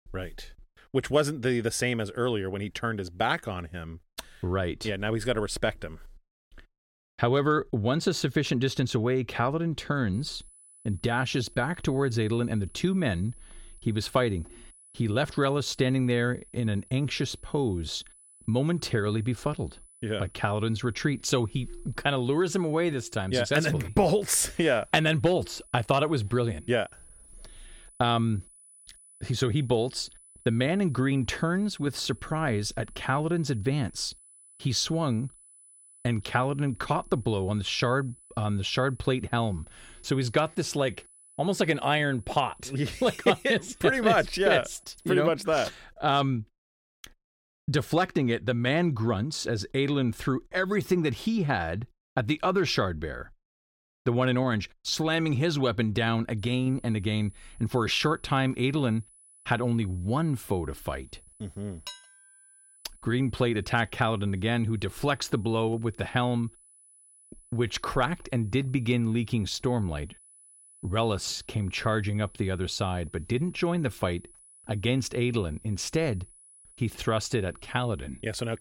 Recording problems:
high-pitched whine; faint; from 10 to 45 s and from 56 s on; 10 kHz, 25 dB below the speech
clattering dishes; faint; at 1:02; peak 15 dB below the speech

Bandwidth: 16.5 kHz